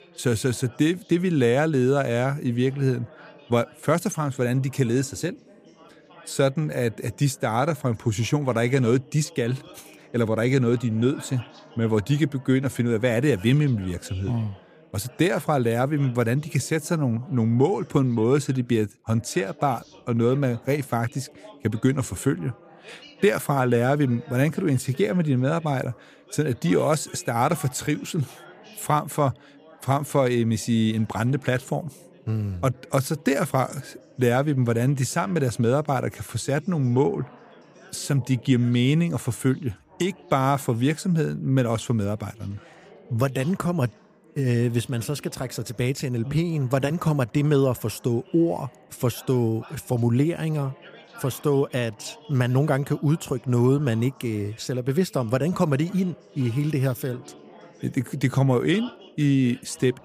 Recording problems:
background chatter; faint; throughout; 3 voices, 25 dB below the speech

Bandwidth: 15 kHz